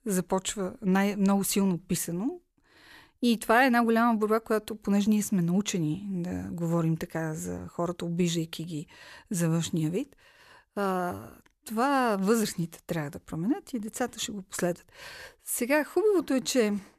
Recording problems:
none

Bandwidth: 14.5 kHz